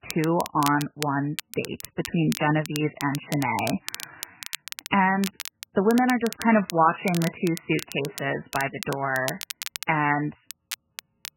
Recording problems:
garbled, watery; badly; nothing above 3 kHz
crackle, like an old record; noticeable; 10 dB below the speech

